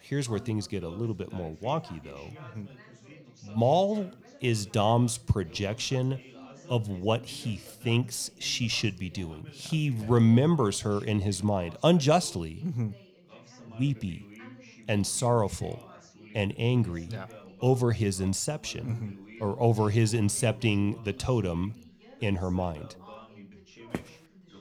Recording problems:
background chatter; faint; throughout; 2 voices, 20 dB below the speech
footsteps; faint; at 24 s; peak 10 dB below the speech

